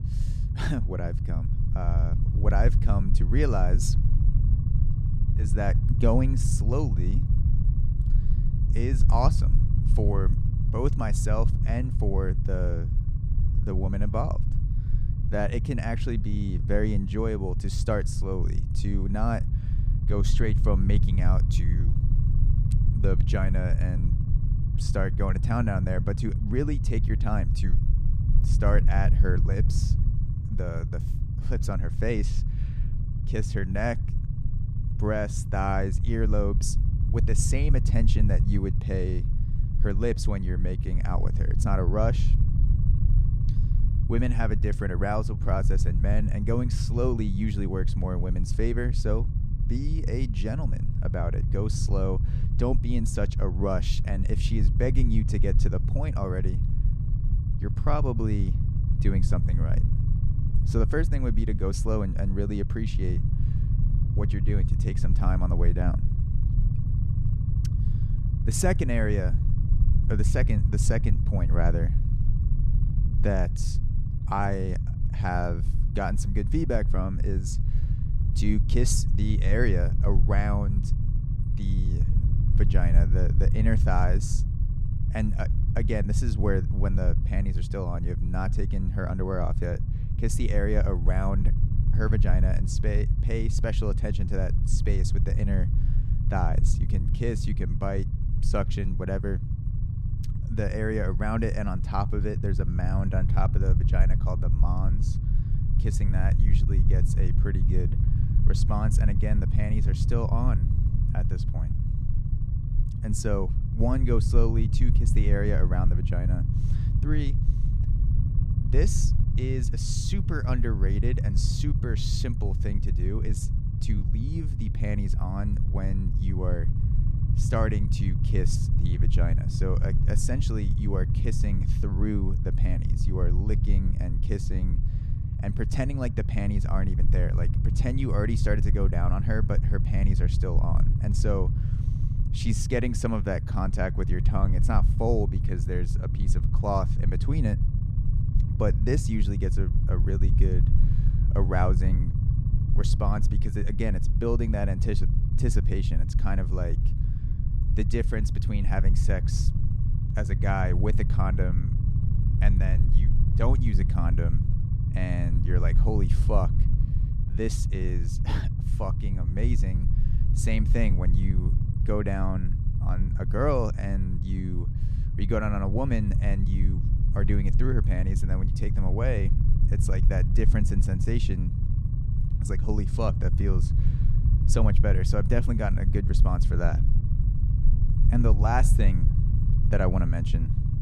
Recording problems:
low rumble; loud; throughout; 7 dB below the speech

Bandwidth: 14.5 kHz